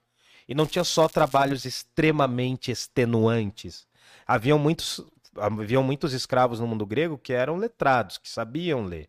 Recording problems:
crackling; faint; at 0.5 s; 20 dB below the speech

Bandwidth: 15 kHz